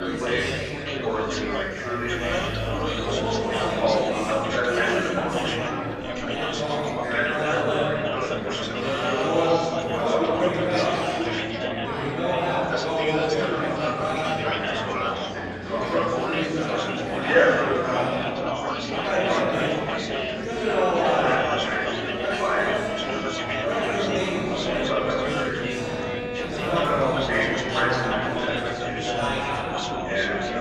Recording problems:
room echo; strong; dies away in 2.2 s
off-mic speech; far
chatter from many people; very loud; throughout; 2 dB above the speech
background music; loud; throughout; 8 dB below the speech
traffic noise; noticeable; throughout; 15 dB below the speech

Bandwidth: 15 kHz